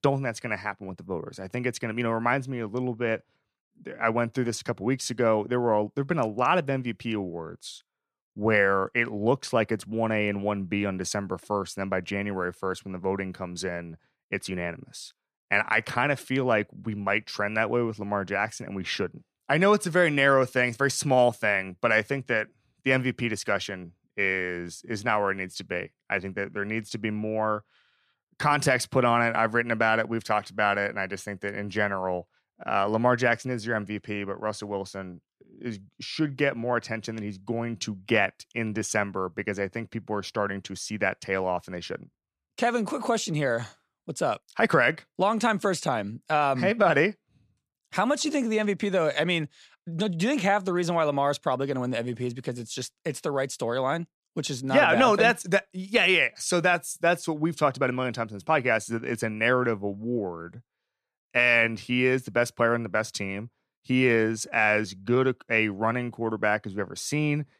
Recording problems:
none

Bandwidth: 14.5 kHz